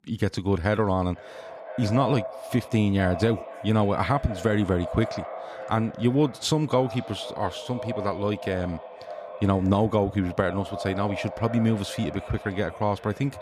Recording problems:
echo of what is said; strong; throughout; 490 ms later, 10 dB below the speech

